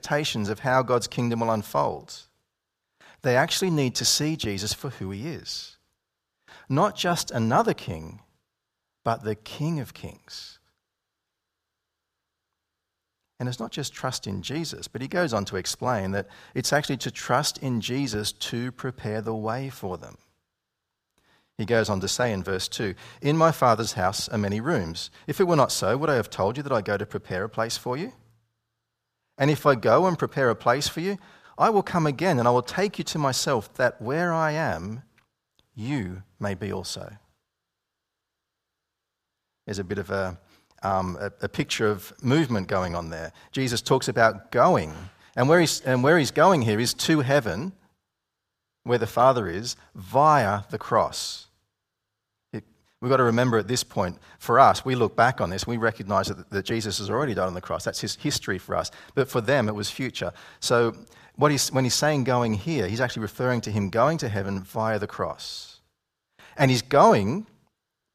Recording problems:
none

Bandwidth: 14.5 kHz